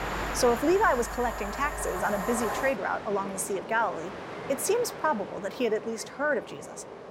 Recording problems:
train or aircraft noise; loud; throughout; 8 dB below the speech

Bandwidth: 16 kHz